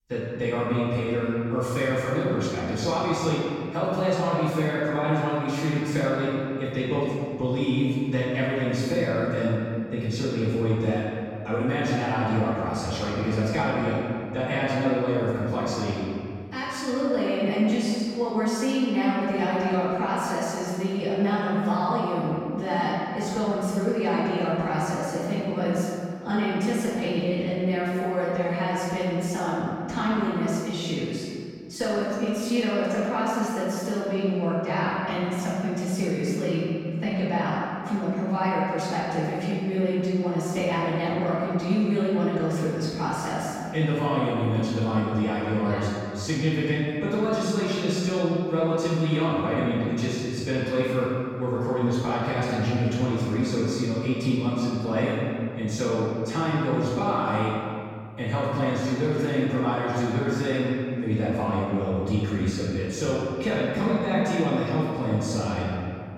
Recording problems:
room echo; strong; dies away in 2.1 s
off-mic speech; far

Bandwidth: 17 kHz